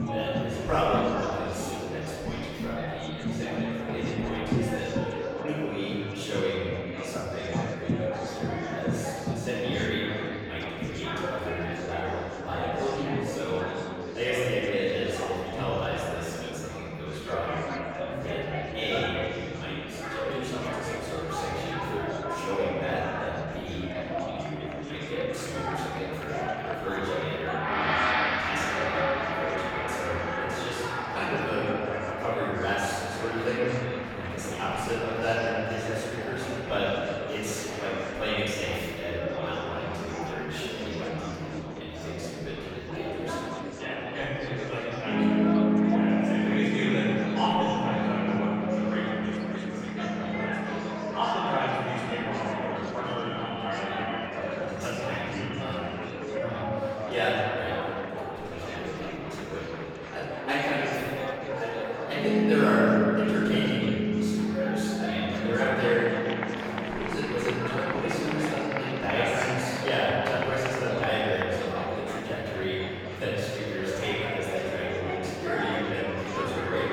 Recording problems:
room echo; strong; dies away in 2.2 s
off-mic speech; far
background music; very loud; throughout; as loud as the speech
chatter from many people; loud; throughout; 3 dB below the speech

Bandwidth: 17.5 kHz